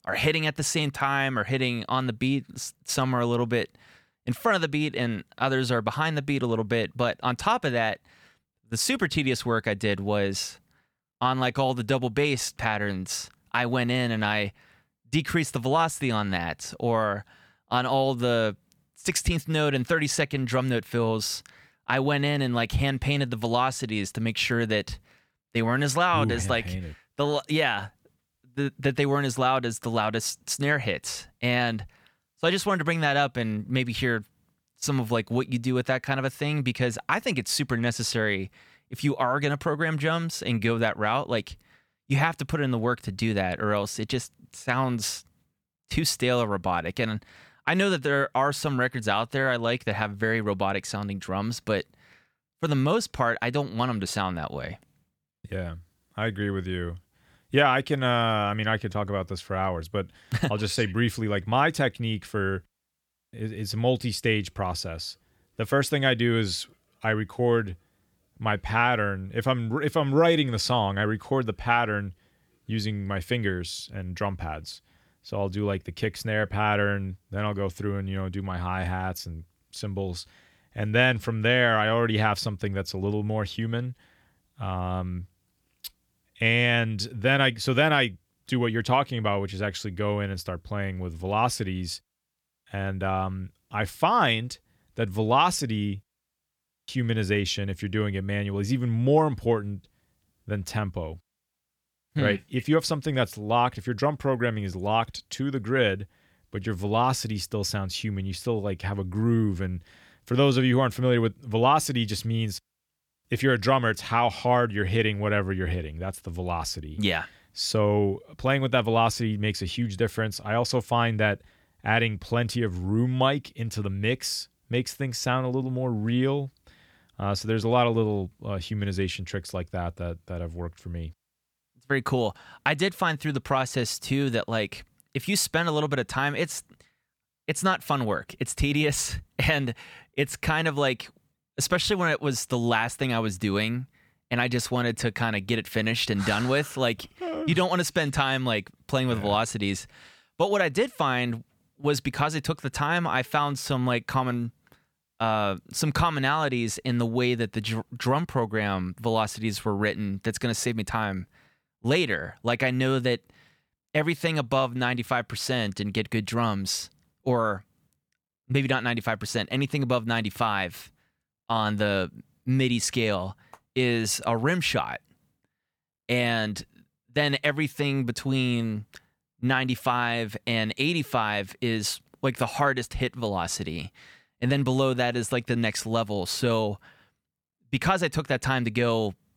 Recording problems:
none

